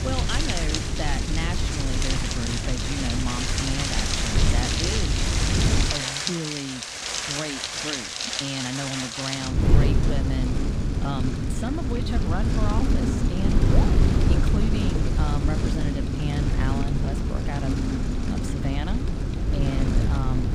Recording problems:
rain or running water; very loud; throughout; 3 dB above the speech
wind noise on the microphone; heavy; until 6 s and from 9.5 s on; 1 dB below the speech

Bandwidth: 15 kHz